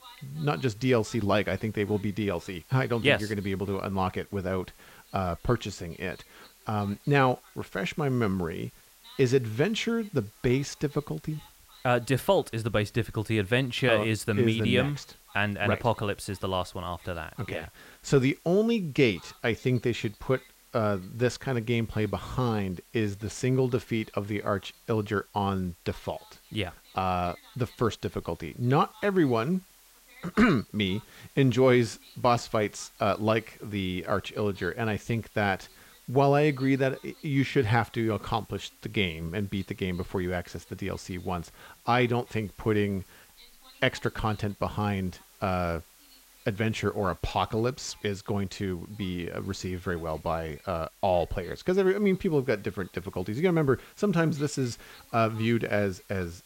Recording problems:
voice in the background; faint; throughout; 30 dB below the speech
hiss; faint; throughout; 25 dB below the speech

